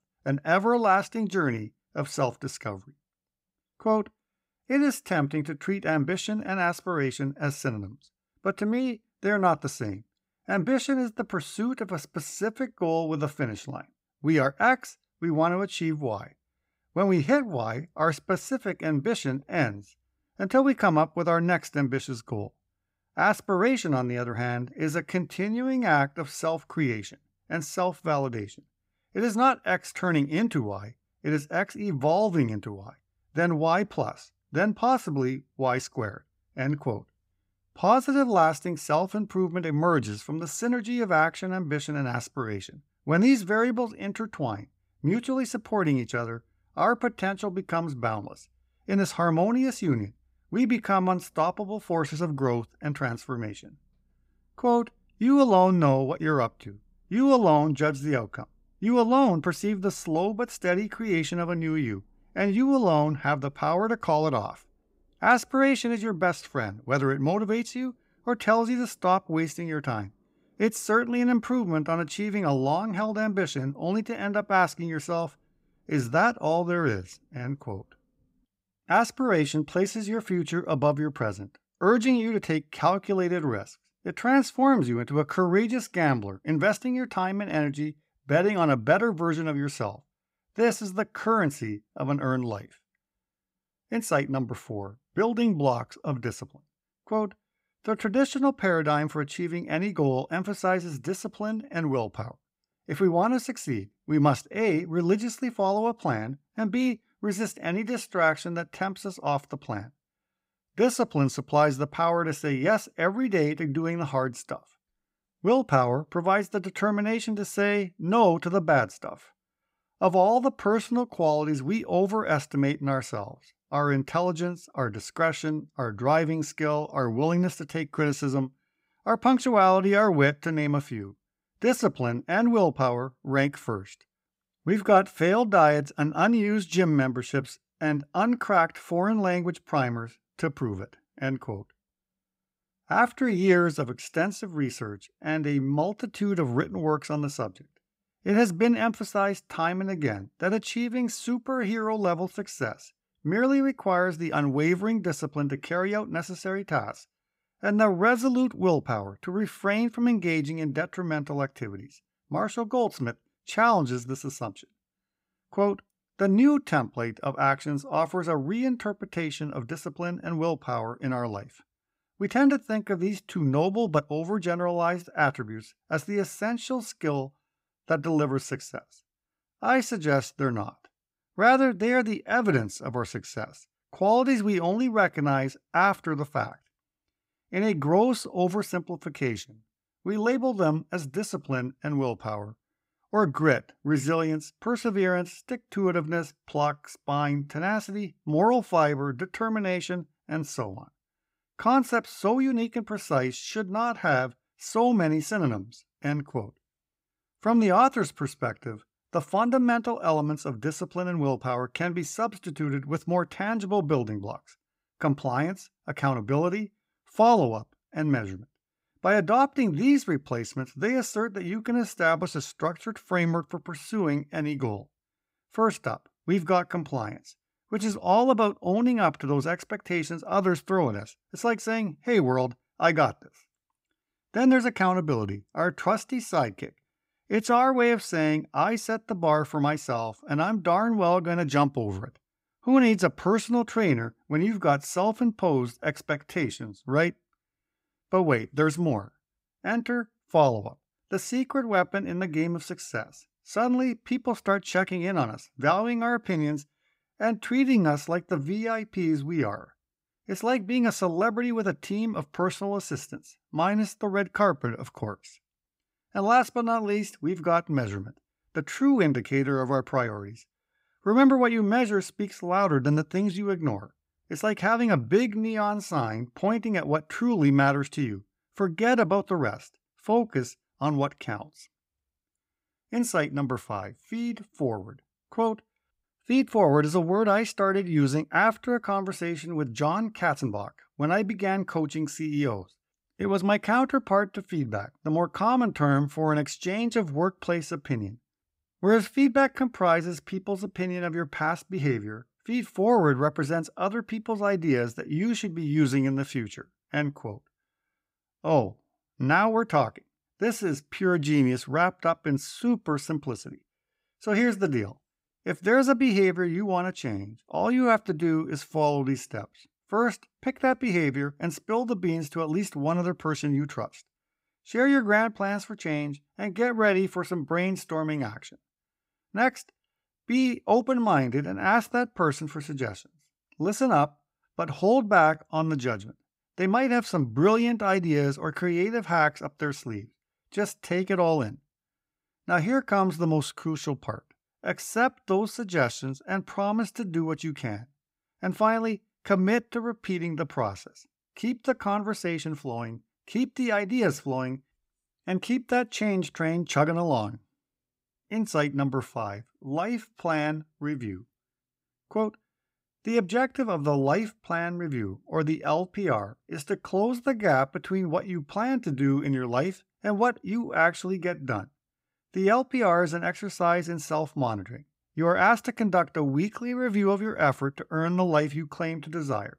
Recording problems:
none

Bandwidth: 15.5 kHz